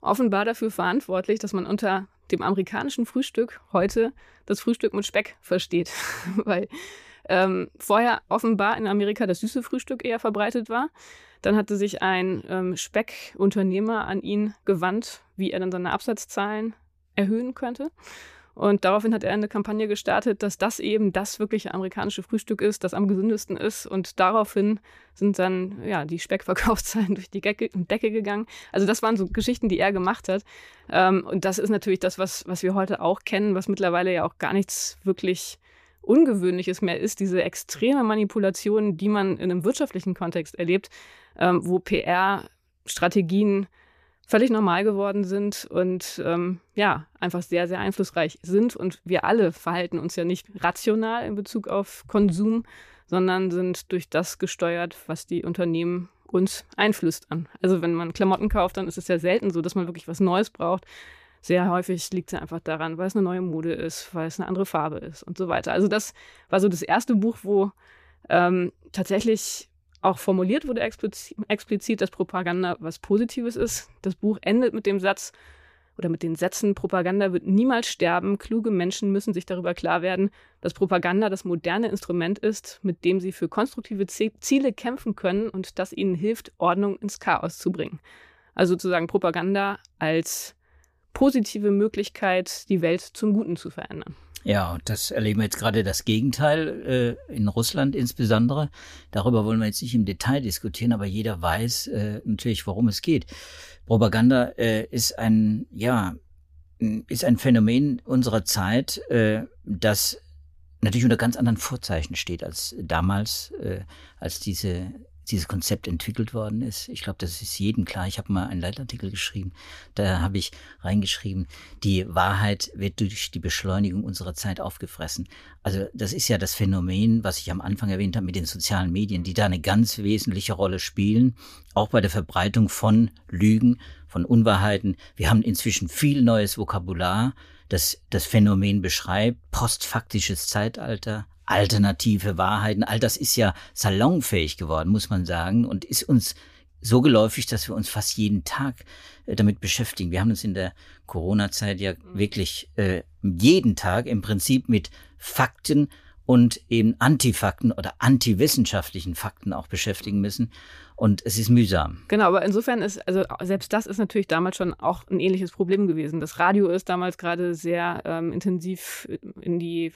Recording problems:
none

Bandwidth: 14.5 kHz